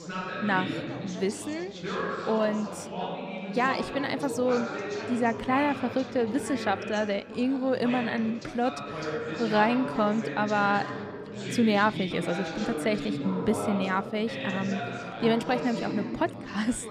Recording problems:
background chatter; loud; throughout; 3 voices, 6 dB below the speech

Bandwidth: 14.5 kHz